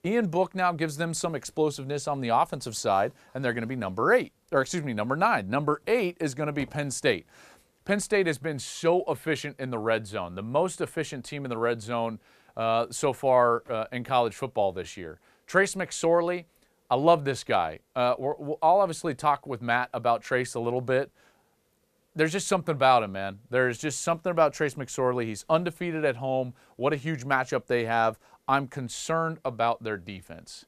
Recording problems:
none

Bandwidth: 14.5 kHz